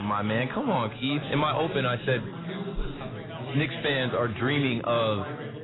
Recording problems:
garbled, watery; badly; nothing above 4 kHz
background chatter; loud; throughout; 4 voices, 9 dB below the speech
abrupt cut into speech; at the start

